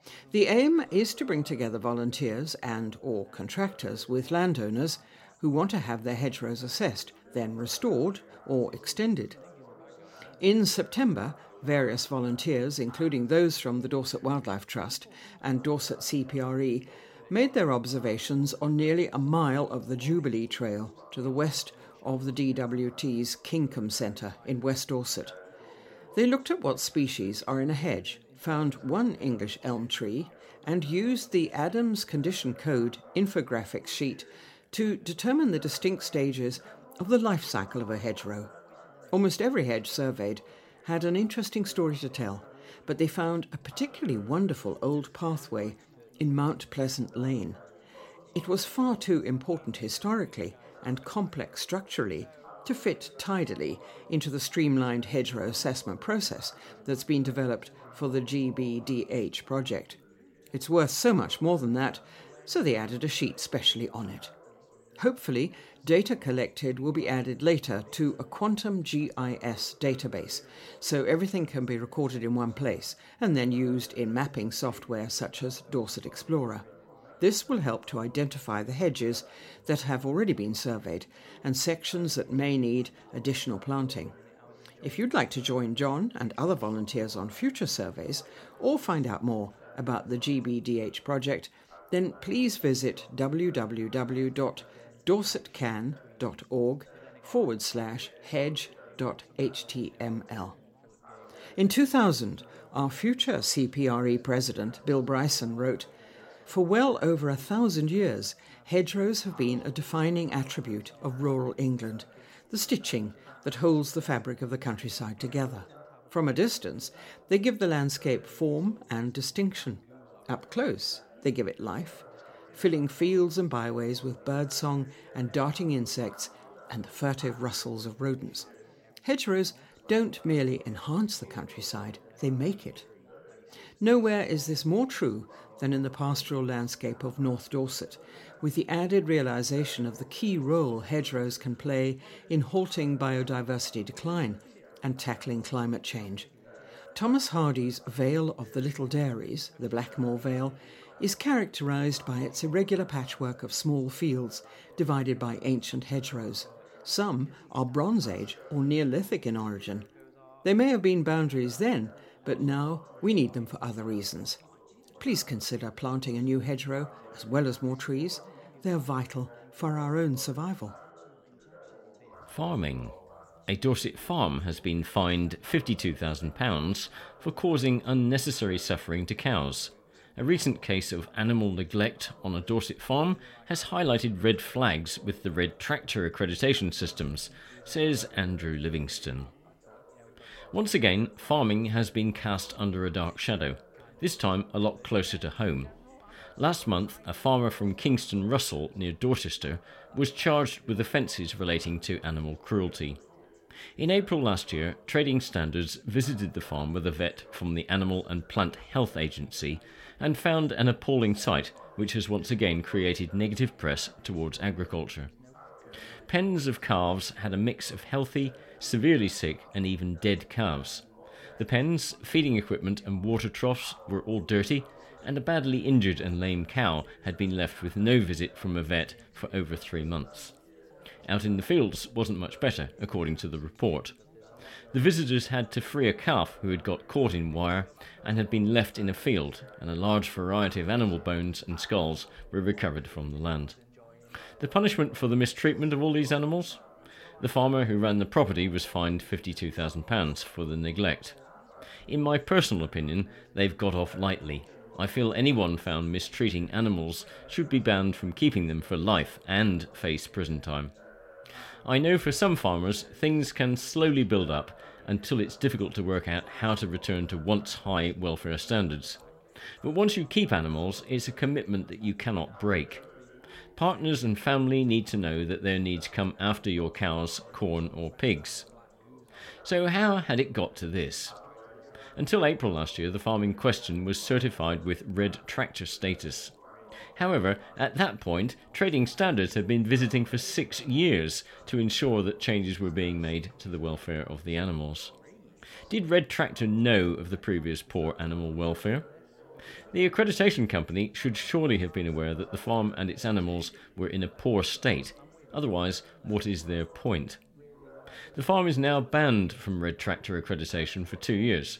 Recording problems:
background chatter; faint; throughout; 3 voices, 25 dB below the speech

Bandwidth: 16.5 kHz